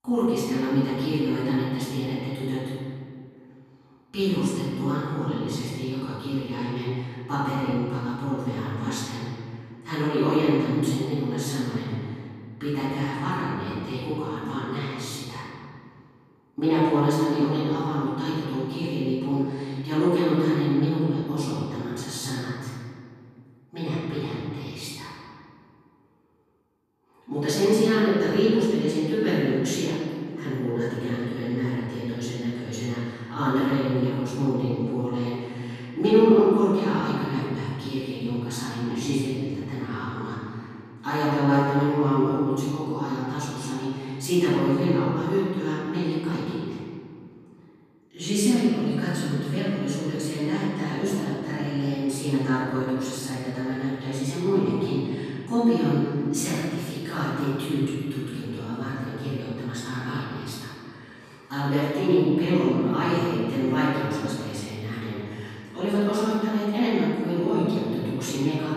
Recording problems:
room echo; strong; dies away in 2 s
off-mic speech; far

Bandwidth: 14 kHz